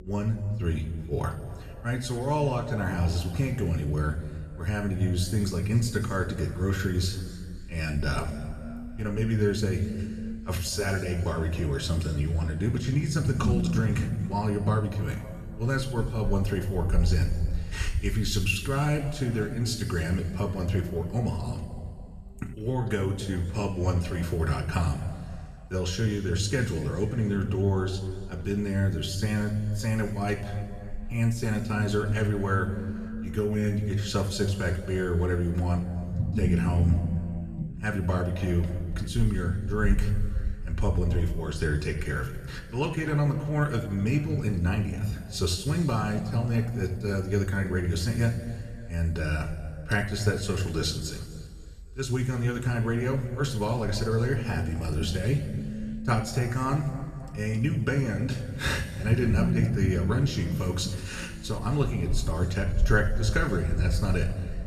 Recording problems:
room echo; noticeable; dies away in 1.8 s
off-mic speech; somewhat distant
low rumble; noticeable; throughout; 15 dB below the speech

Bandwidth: 14 kHz